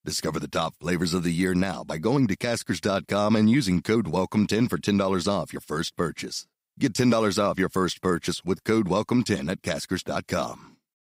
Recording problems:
none

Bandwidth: 15.5 kHz